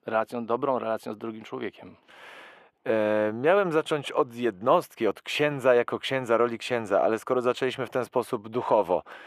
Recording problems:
muffled; very; fading above 2 kHz
thin; somewhat; fading below 450 Hz

